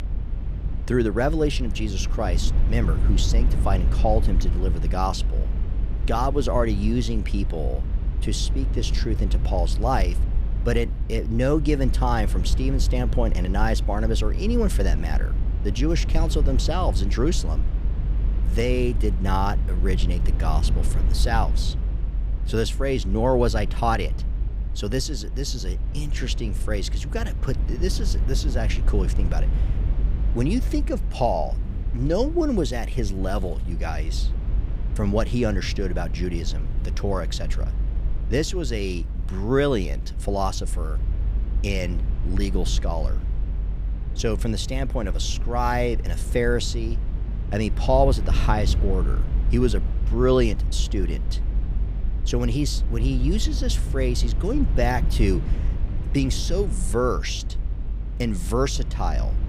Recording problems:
low rumble; noticeable; throughout; 15 dB below the speech

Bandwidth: 15 kHz